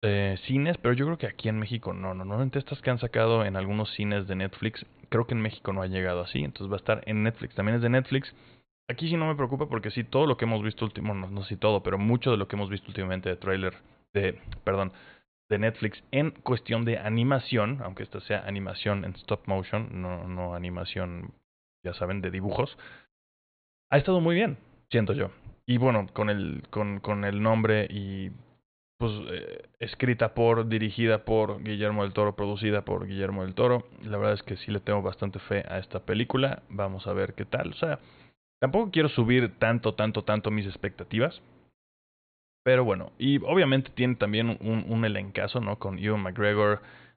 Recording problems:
high frequencies cut off; severe; nothing above 4.5 kHz

